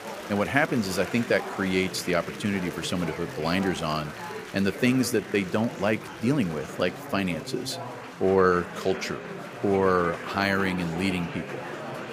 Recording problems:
chatter from many people; noticeable; throughout; 10 dB below the speech

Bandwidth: 15 kHz